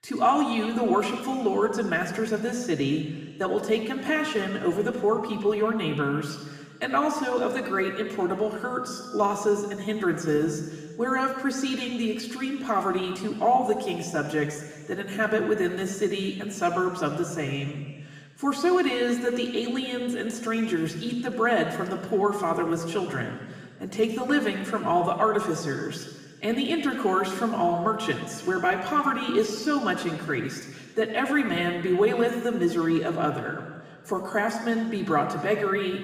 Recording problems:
room echo; noticeable; dies away in 1.7 s
off-mic speech; somewhat distant

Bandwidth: 15 kHz